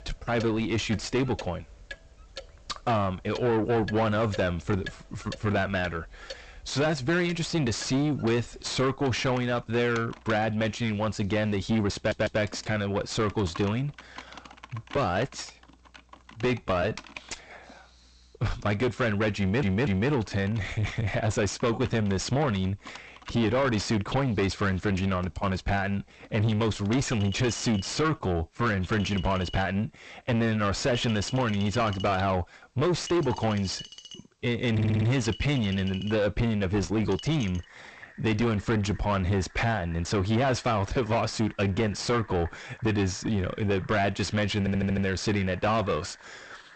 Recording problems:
distortion; heavy; 5 dB below the speech
garbled, watery; slightly; nothing above 8 kHz
household noises; noticeable; throughout; 15 dB below the speech
uneven, jittery; slightly; from 12 to 42 s
audio stuttering; 4 times, first at 12 s

